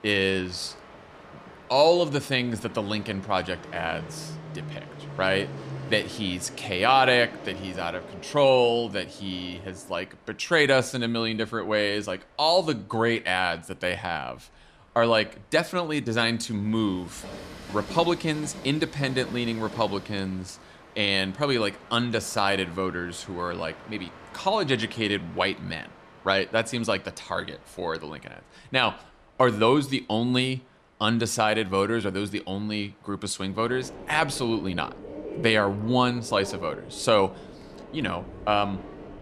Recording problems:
train or aircraft noise; noticeable; throughout; 15 dB below the speech

